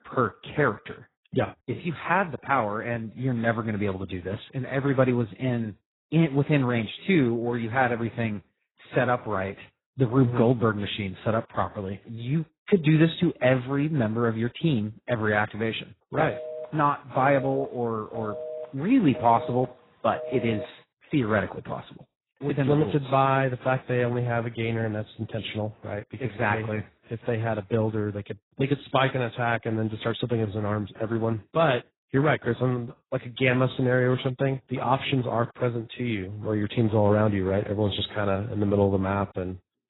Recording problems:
garbled, watery; badly; nothing above 4 kHz
phone ringing; noticeable; from 16 to 21 s; peak 8 dB below the speech

